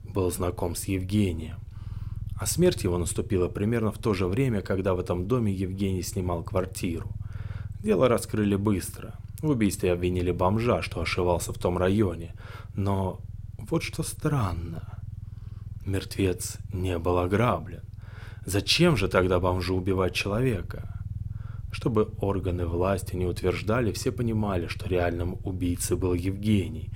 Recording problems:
low rumble; faint; throughout; 25 dB below the speech

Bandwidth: 16 kHz